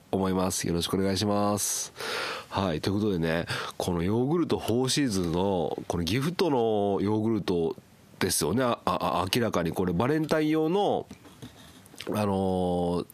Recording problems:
squashed, flat; heavily

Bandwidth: 14.5 kHz